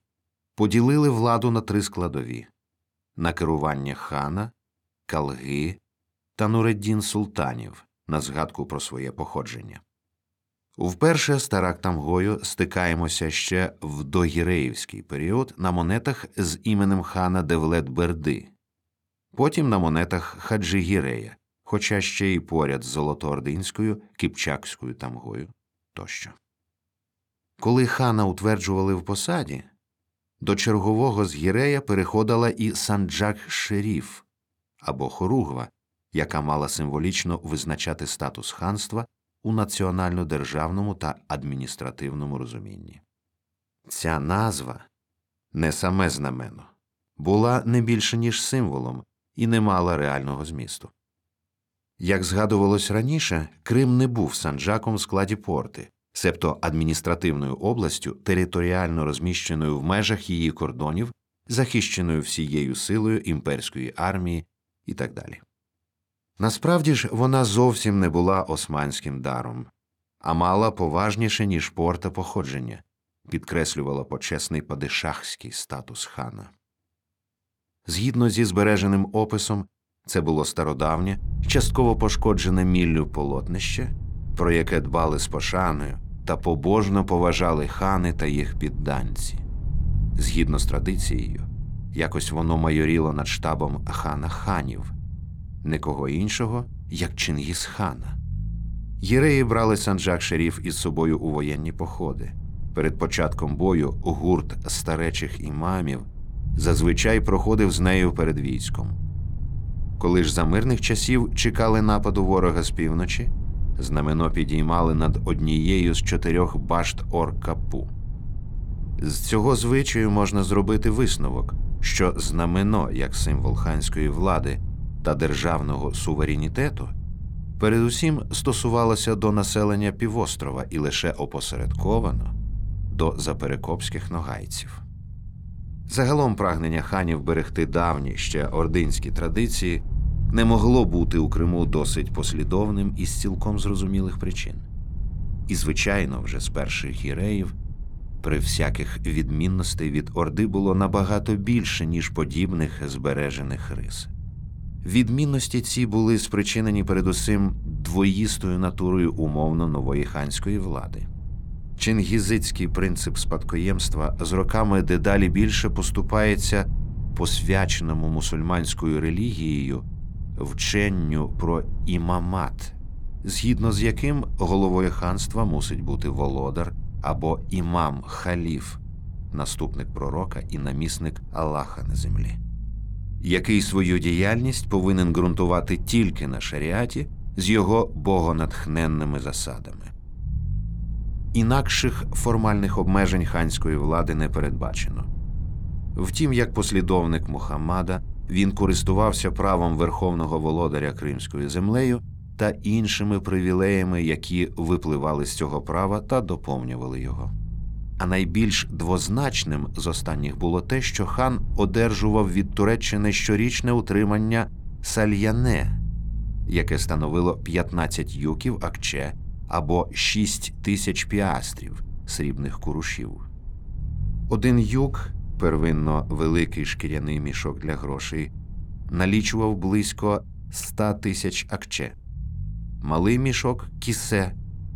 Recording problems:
low rumble; faint; from 1:21 on; 20 dB below the speech

